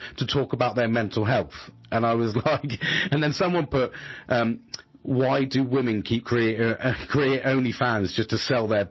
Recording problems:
distortion; heavy; 10% of the sound clipped
garbled, watery; slightly
squashed, flat; somewhat

